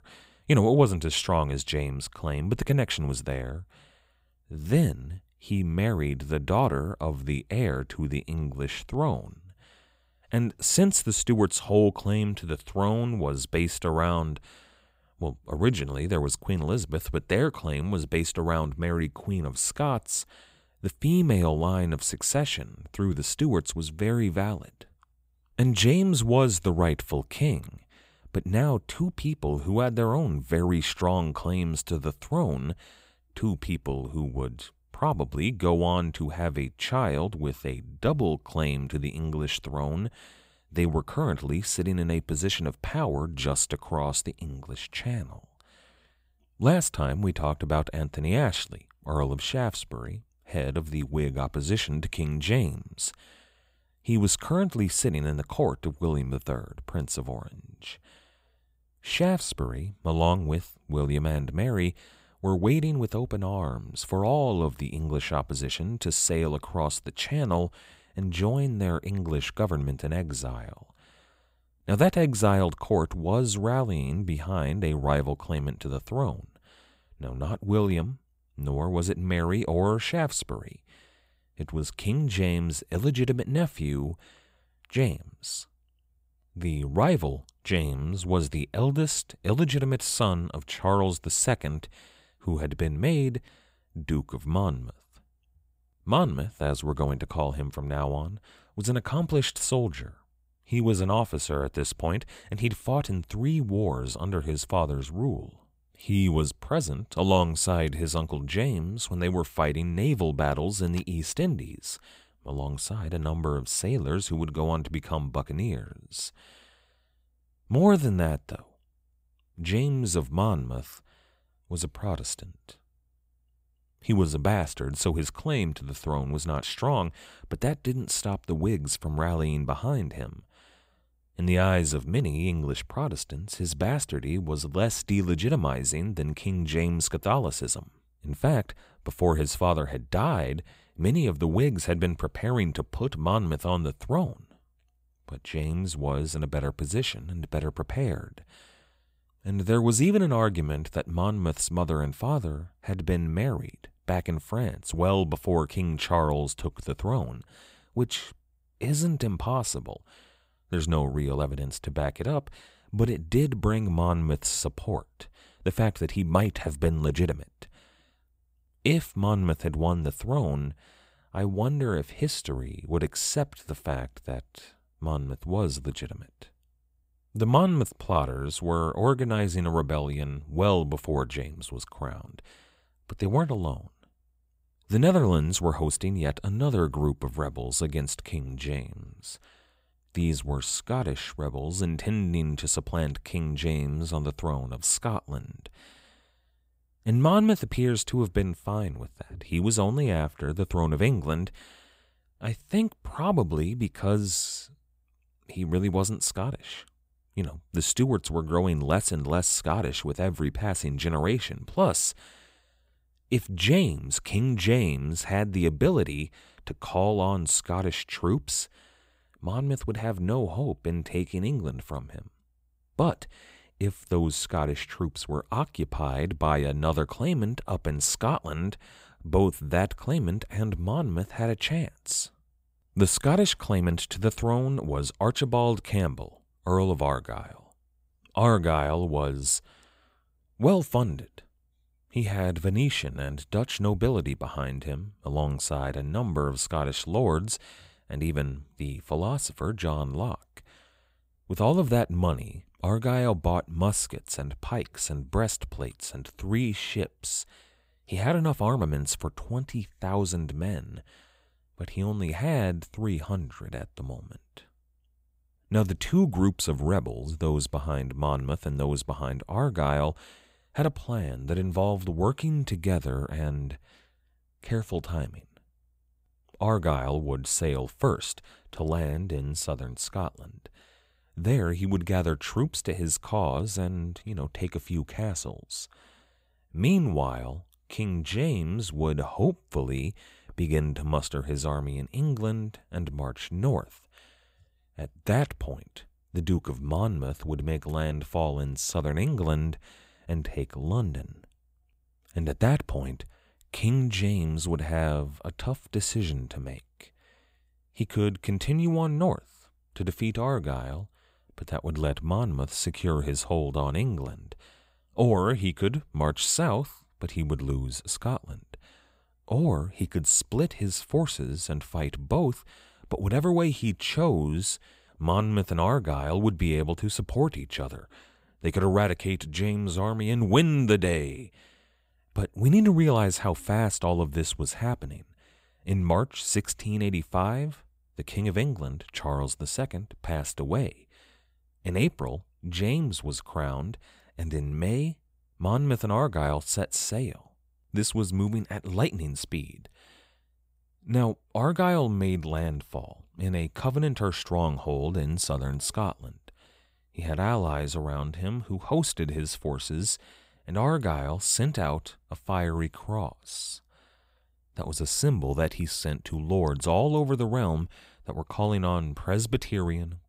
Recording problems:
none

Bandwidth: 15.5 kHz